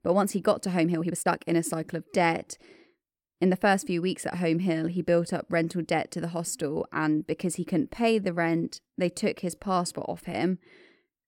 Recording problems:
uneven, jittery; strongly; from 1 to 10 s

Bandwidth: 16.5 kHz